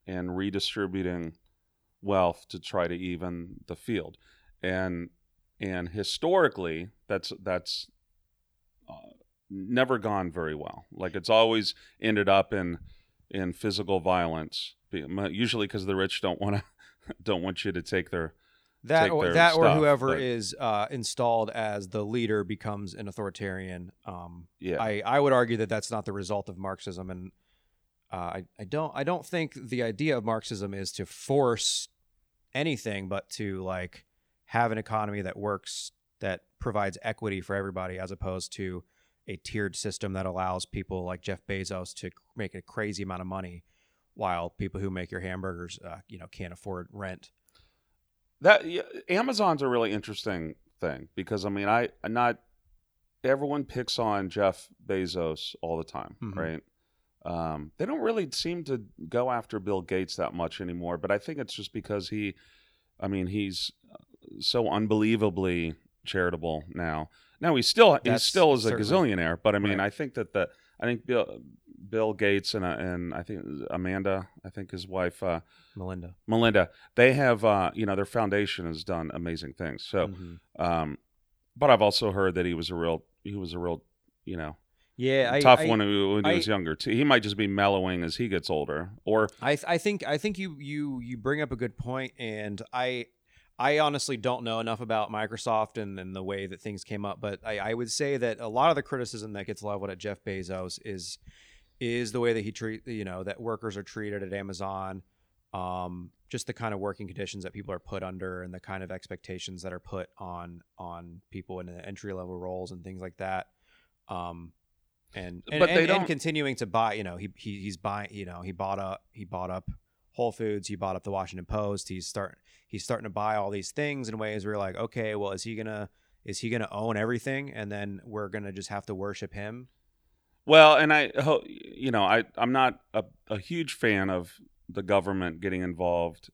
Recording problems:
none

